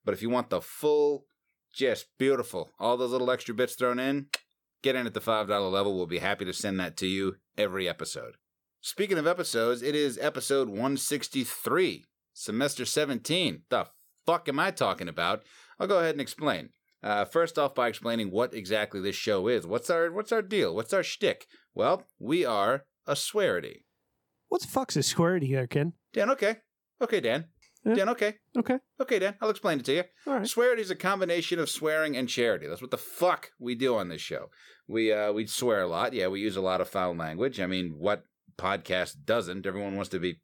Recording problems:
none

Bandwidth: 18 kHz